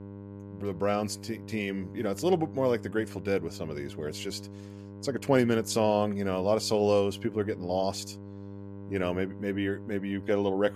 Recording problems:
electrical hum; noticeable; throughout; 50 Hz, 20 dB below the speech

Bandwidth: 14.5 kHz